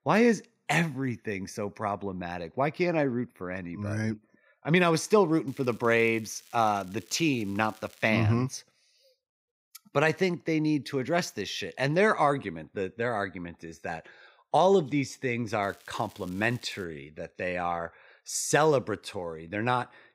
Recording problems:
crackling; faint; from 5.5 to 8 s and from 16 to 17 s; 25 dB below the speech

